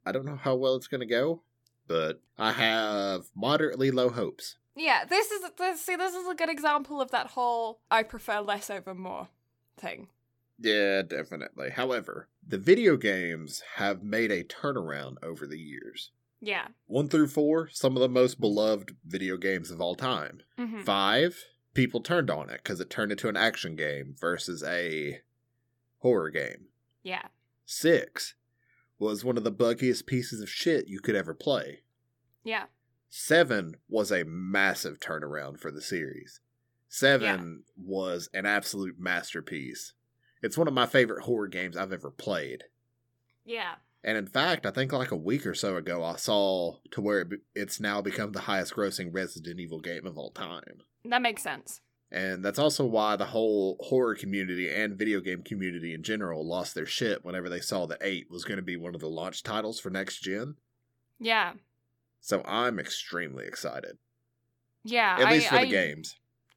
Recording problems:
none

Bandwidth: 17.5 kHz